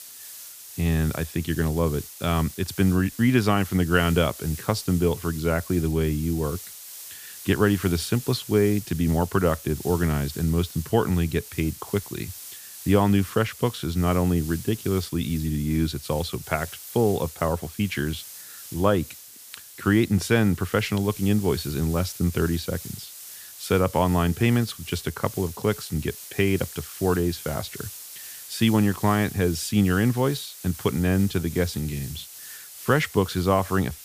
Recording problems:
hiss; noticeable; throughout; 15 dB below the speech

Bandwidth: 15 kHz